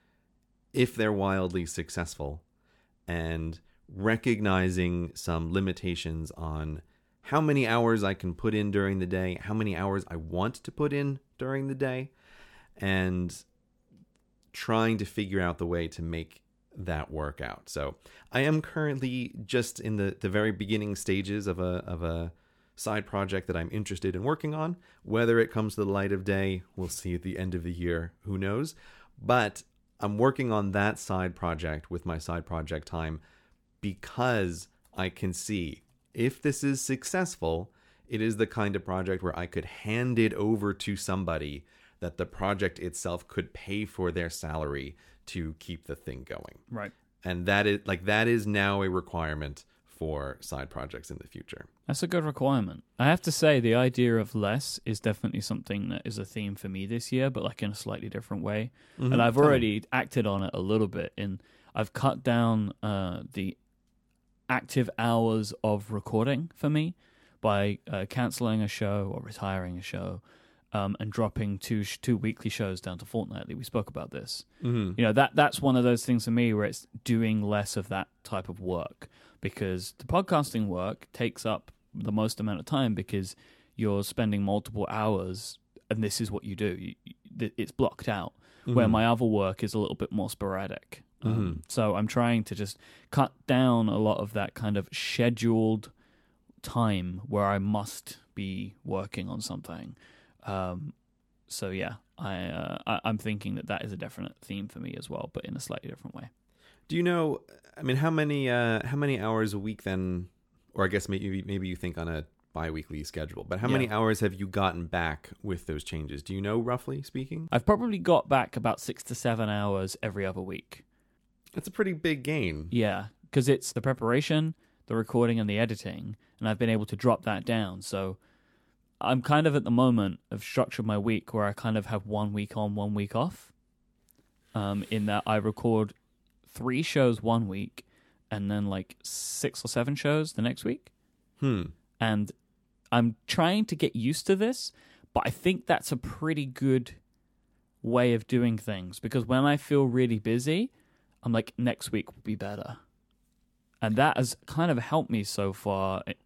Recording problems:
none

